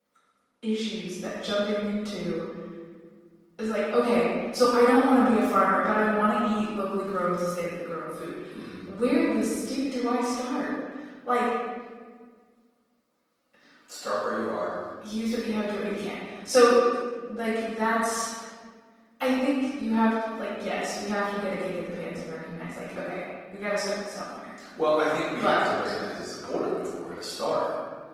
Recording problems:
room echo; strong; dies away in 1.4 s
off-mic speech; far
garbled, watery; slightly
thin; very slightly; fading below 350 Hz

